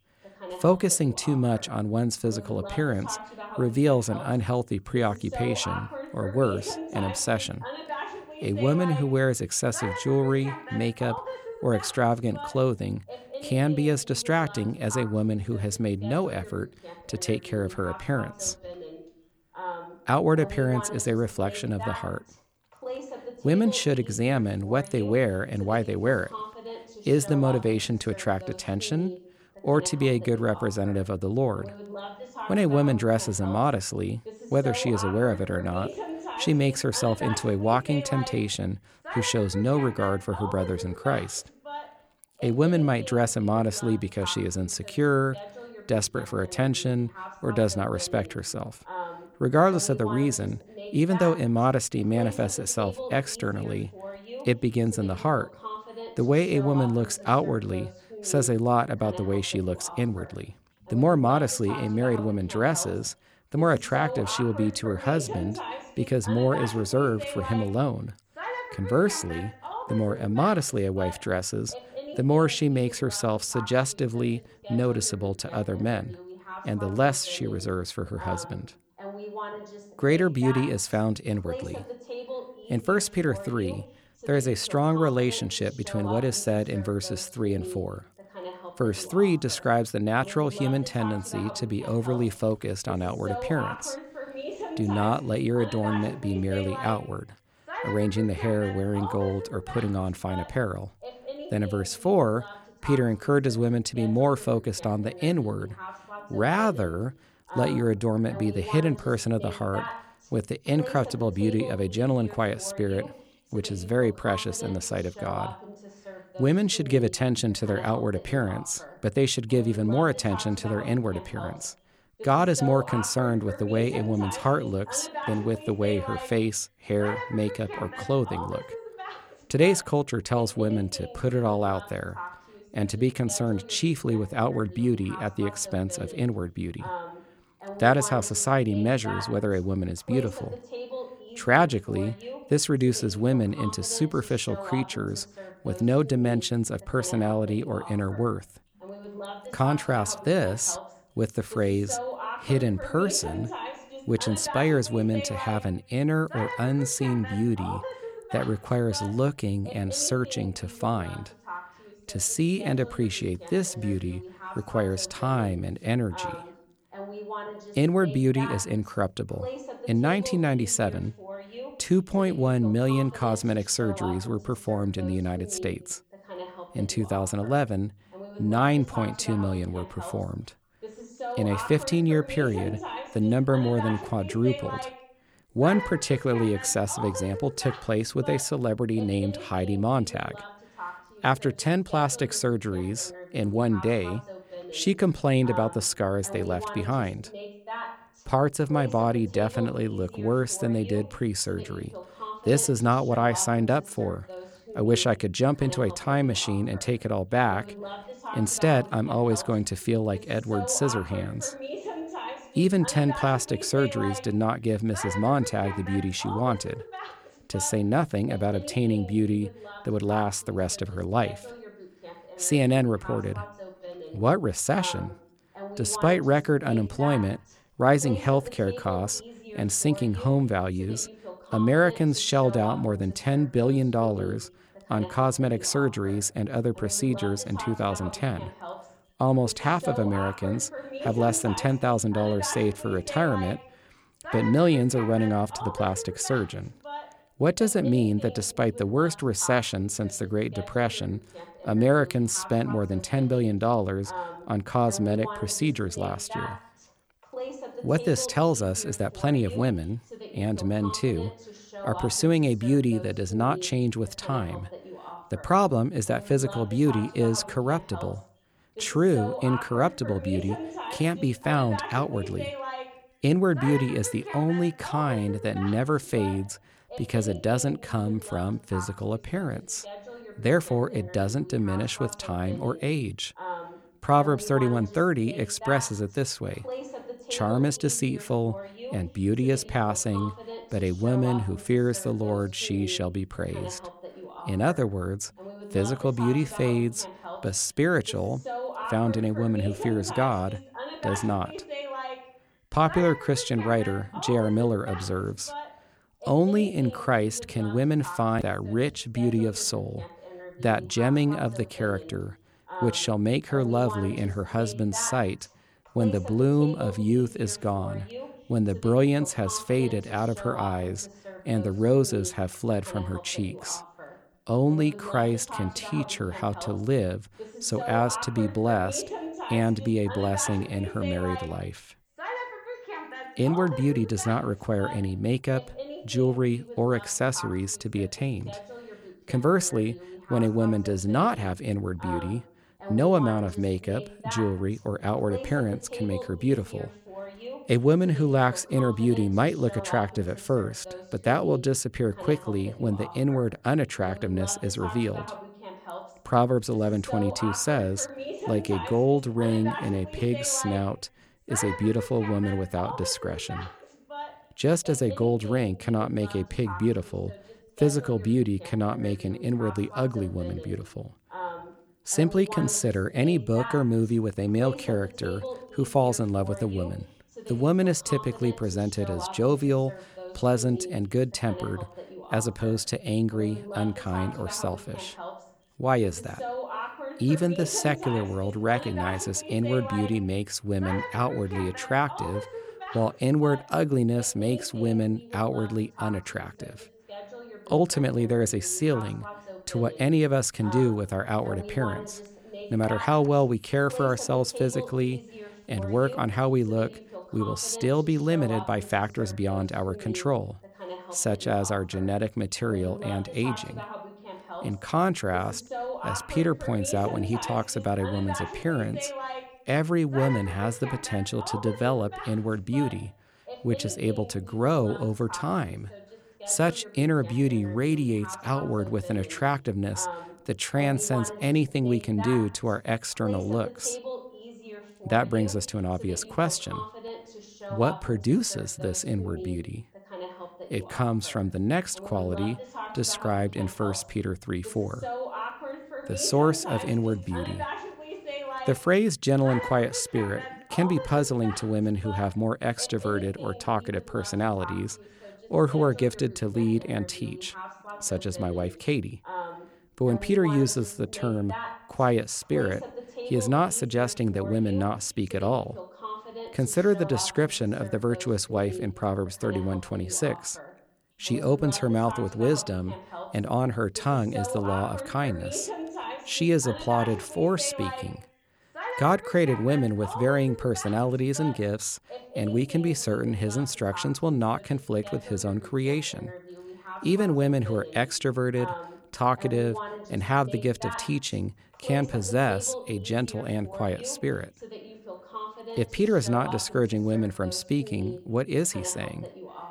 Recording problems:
voice in the background; noticeable; throughout; 15 dB below the speech

